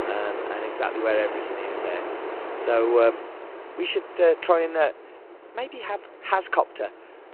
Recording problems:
phone-call audio; nothing above 4 kHz
wind in the background; loud; throughout; 8 dB below the speech

